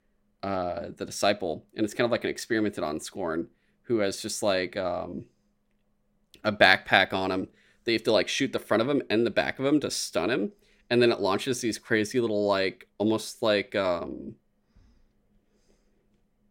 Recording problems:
none

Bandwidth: 16.5 kHz